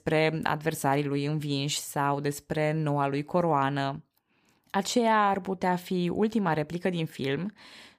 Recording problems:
none

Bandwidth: 15 kHz